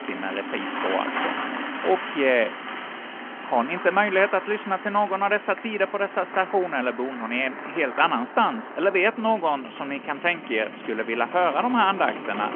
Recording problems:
phone-call audio
traffic noise; loud; throughout; 9 dB below the speech

